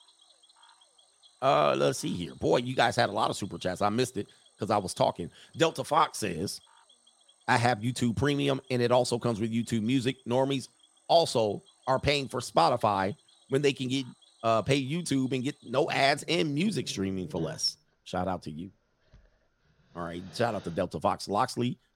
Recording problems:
animal sounds; faint; throughout; 25 dB below the speech

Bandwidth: 16 kHz